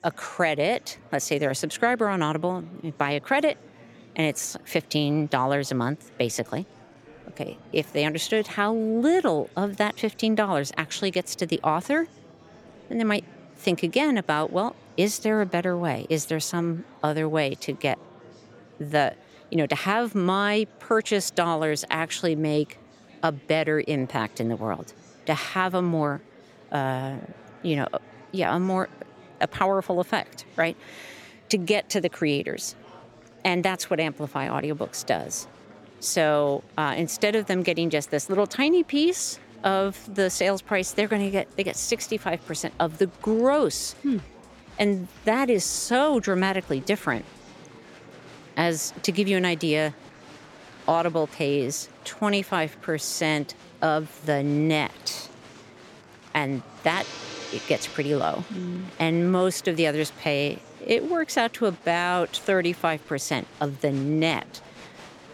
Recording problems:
background music; faint; throughout; 25 dB below the speech
murmuring crowd; faint; throughout; 25 dB below the speech

